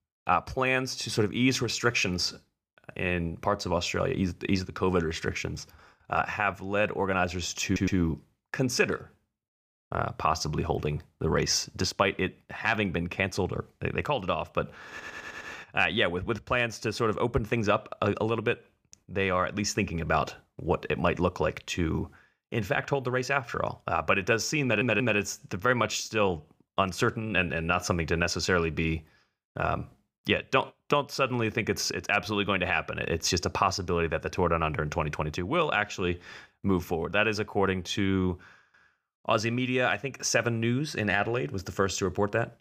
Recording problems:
audio stuttering; at 7.5 s, at 15 s and at 25 s

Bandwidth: 15 kHz